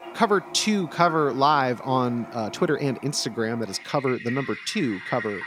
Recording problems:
household noises; noticeable; throughout; 15 dB below the speech

